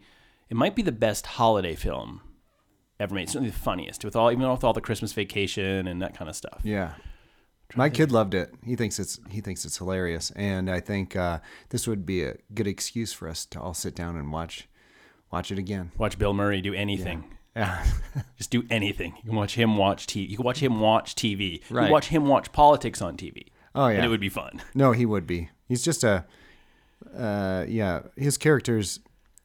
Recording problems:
none

